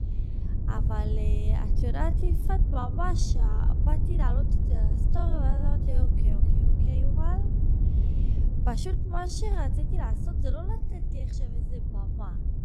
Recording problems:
wrong speed, natural pitch; too slow; 0.6 times normal speed
wind noise on the microphone; heavy; 5 dB below the speech
low rumble; very faint; throughout; 25 dB below the speech
uneven, jittery; strongly; from 0.5 to 11 s

